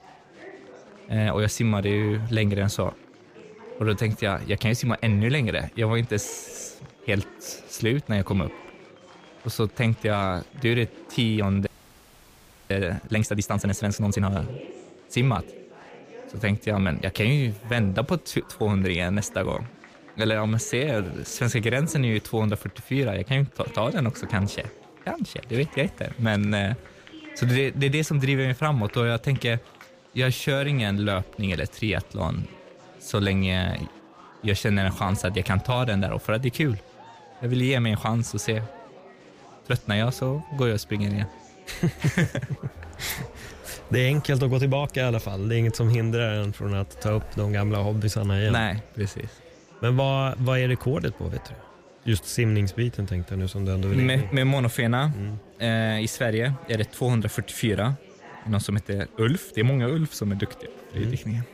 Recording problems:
chatter from many people; faint; throughout; 20 dB below the speech
audio freezing; at 12 s for 1 s

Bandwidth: 15 kHz